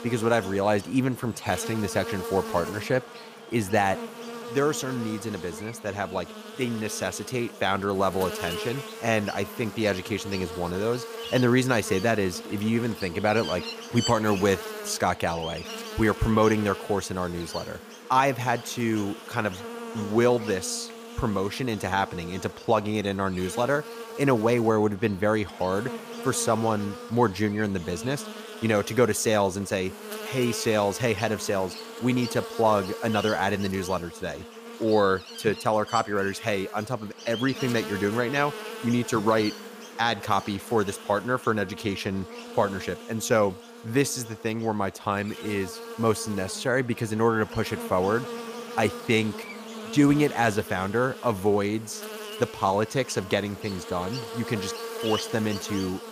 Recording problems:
electrical hum; noticeable; throughout; 60 Hz, 10 dB below the speech

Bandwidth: 15 kHz